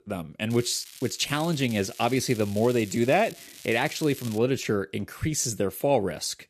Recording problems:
crackling; noticeable; until 4.5 s; 15 dB below the speech

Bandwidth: 14.5 kHz